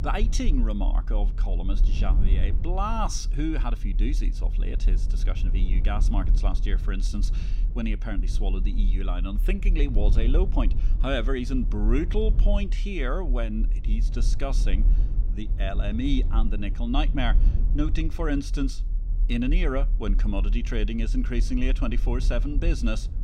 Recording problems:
low rumble; noticeable; throughout; 15 dB below the speech

